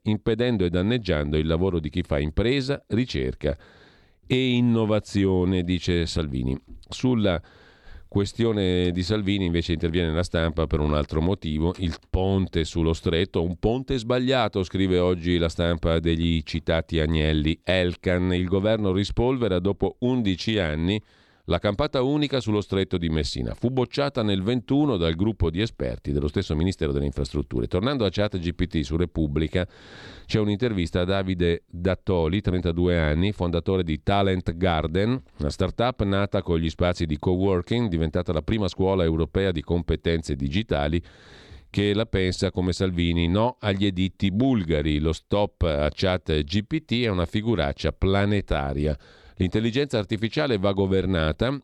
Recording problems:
none

